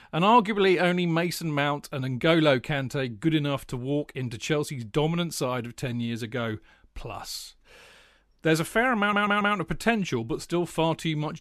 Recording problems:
audio stuttering; at 9 s

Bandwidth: 13.5 kHz